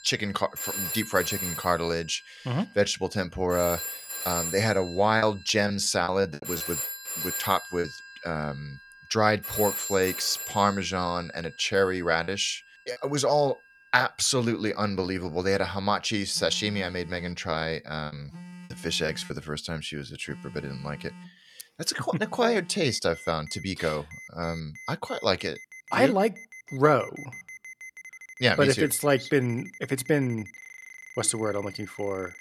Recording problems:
alarms or sirens; loud; throughout; 10 dB below the speech
choppy; very; from 5 to 8 s, at 12 s and from 18 to 19 s; 11% of the speech affected

